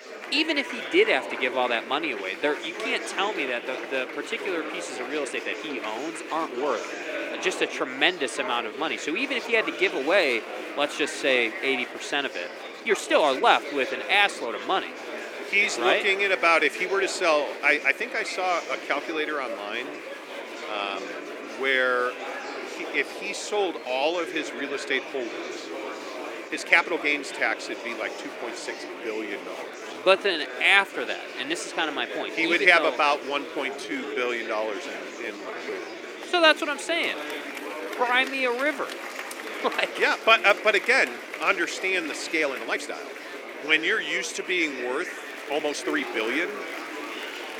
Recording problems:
thin; somewhat; fading below 300 Hz
murmuring crowd; noticeable; throughout; 10 dB below the speech
uneven, jittery; strongly; from 5 to 46 s

